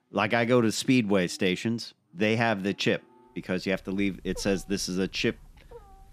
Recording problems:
animal sounds; faint; throughout; 25 dB below the speech

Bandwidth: 14.5 kHz